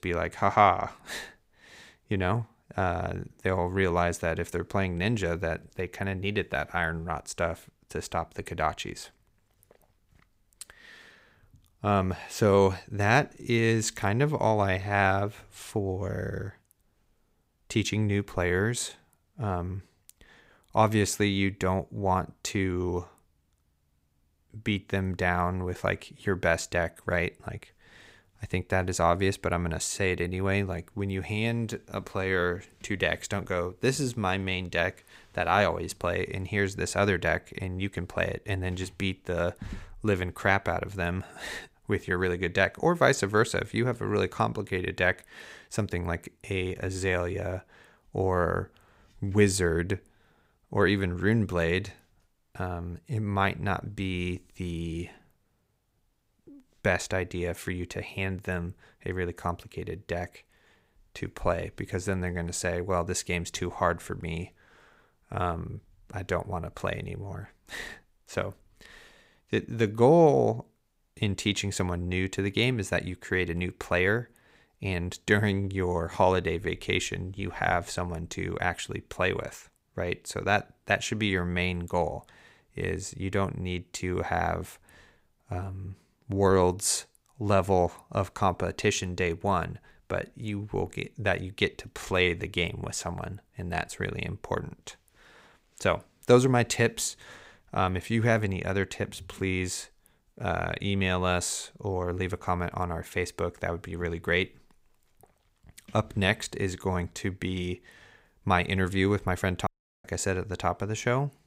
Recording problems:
audio cutting out; at 1:50

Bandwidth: 15.5 kHz